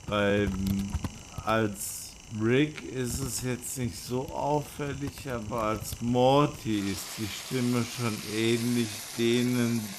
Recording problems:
wrong speed, natural pitch; too slow; 0.5 times normal speed
household noises; noticeable; throughout; 10 dB below the speech

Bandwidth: 14.5 kHz